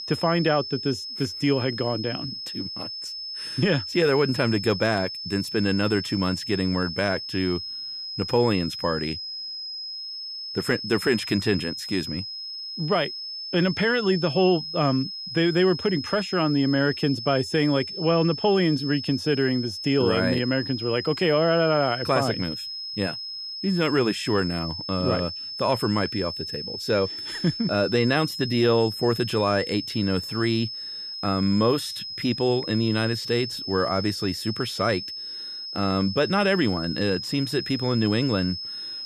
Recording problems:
high-pitched whine; loud; throughout; 5 kHz, 7 dB below the speech

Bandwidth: 14.5 kHz